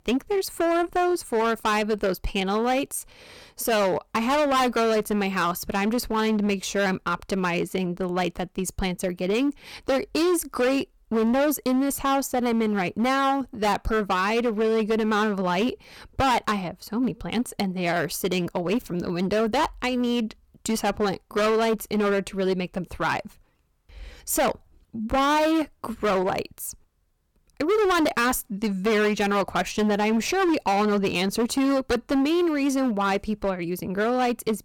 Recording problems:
distortion; heavy; 15% of the sound clipped

